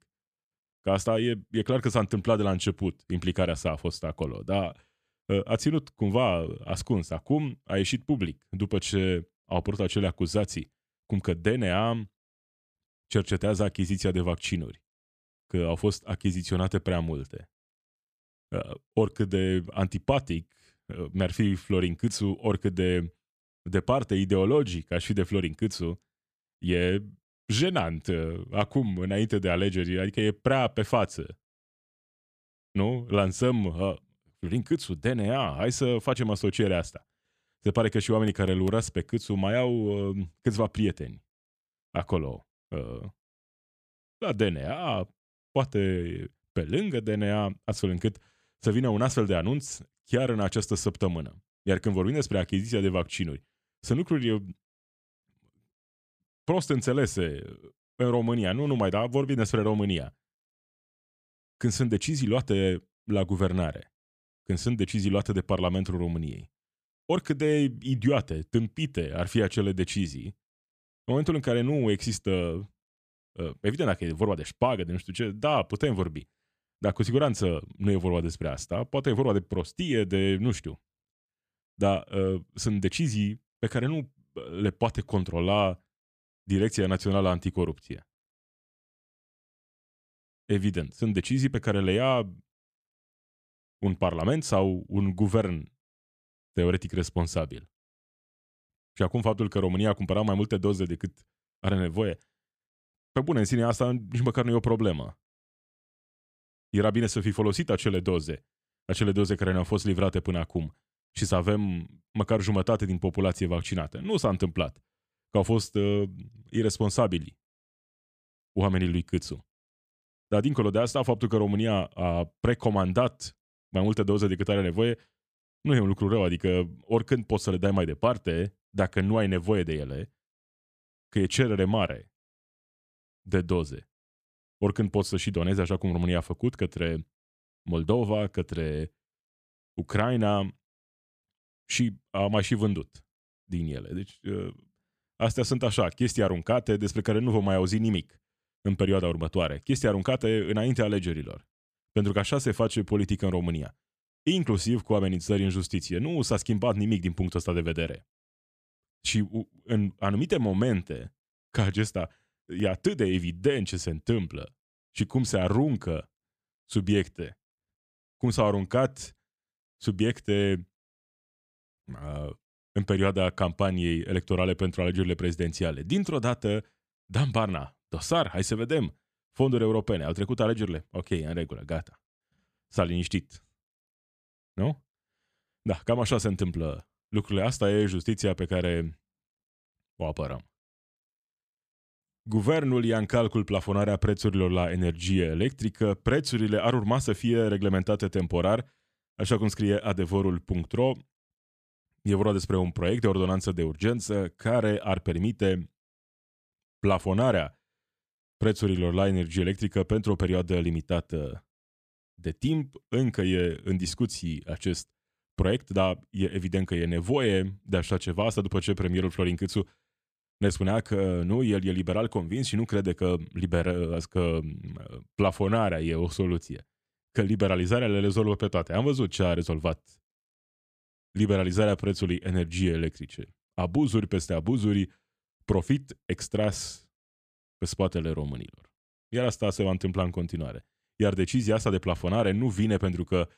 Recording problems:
none

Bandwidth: 14.5 kHz